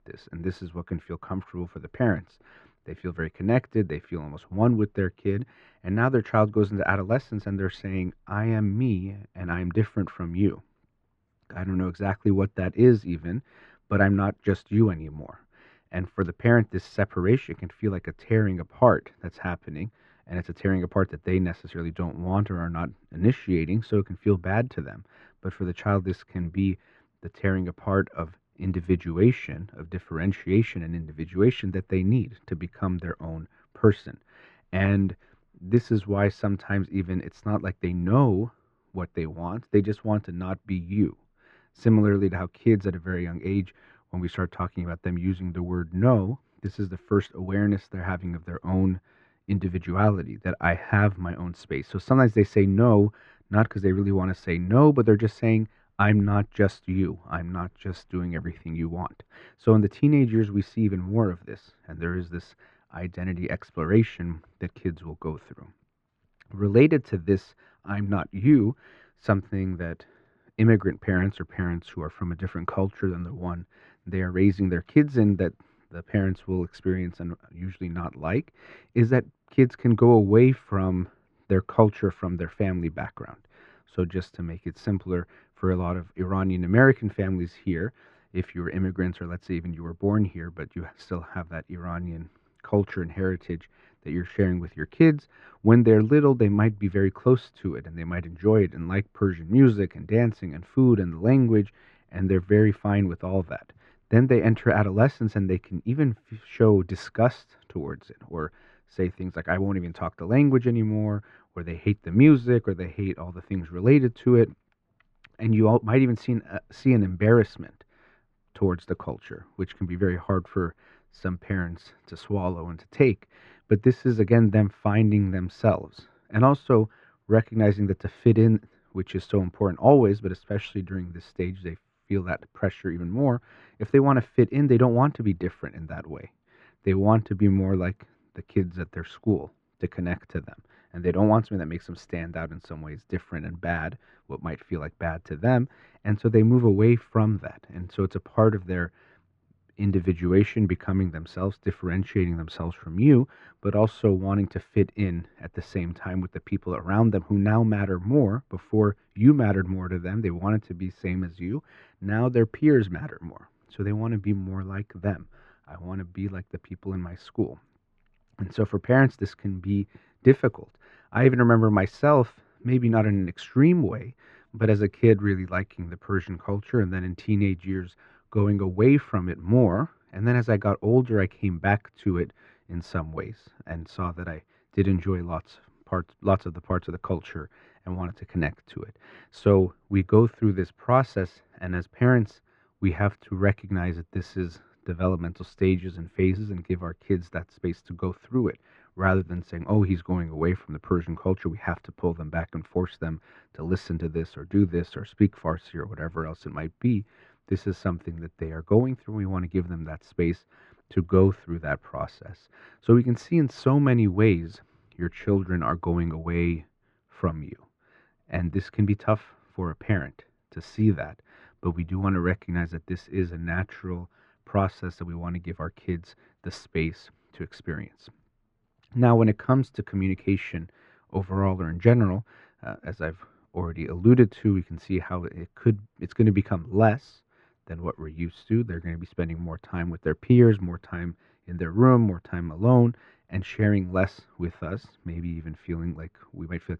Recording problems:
muffled; very; fading above 1.5 kHz

